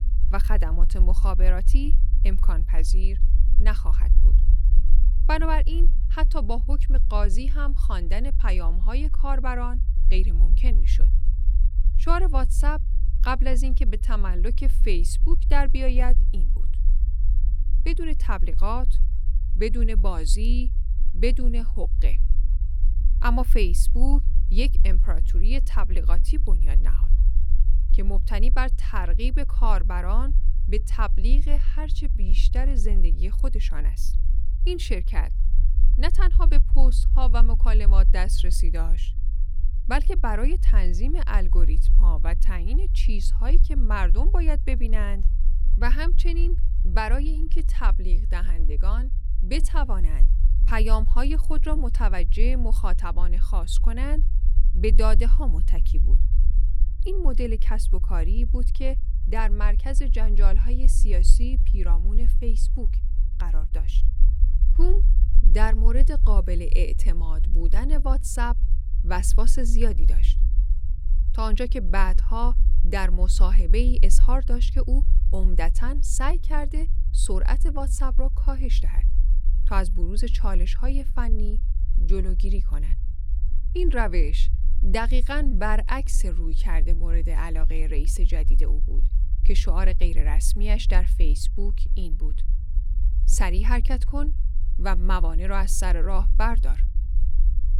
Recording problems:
low rumble; noticeable; throughout; 15 dB below the speech

